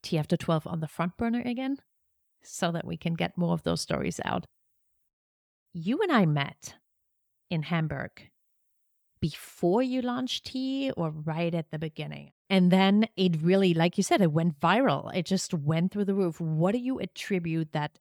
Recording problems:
none

